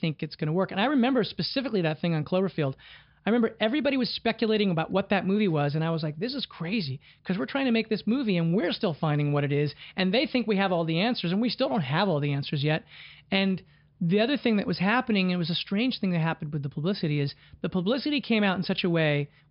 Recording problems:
high frequencies cut off; noticeable; nothing above 5.5 kHz

